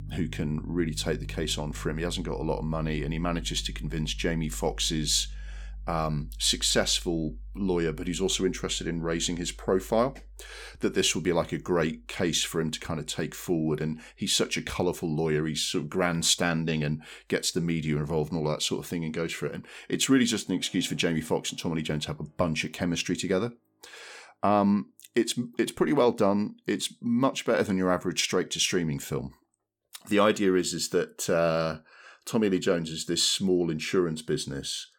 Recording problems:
background music; noticeable; throughout; 15 dB below the speech

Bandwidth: 17 kHz